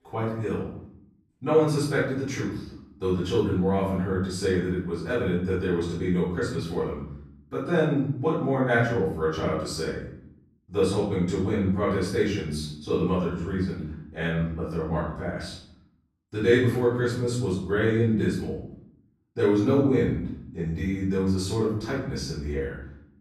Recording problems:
off-mic speech; far
room echo; noticeable; dies away in 0.7 s

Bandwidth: 14 kHz